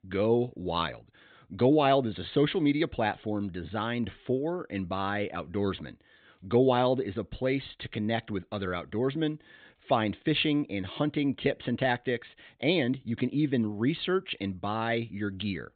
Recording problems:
high frequencies cut off; severe; nothing above 4 kHz

